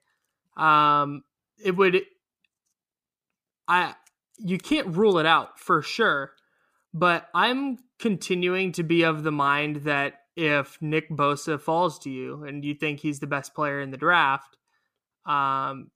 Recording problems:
none

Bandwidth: 15 kHz